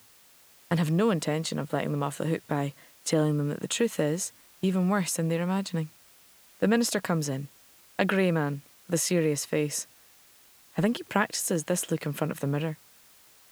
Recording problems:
hiss; faint; throughout; 25 dB below the speech

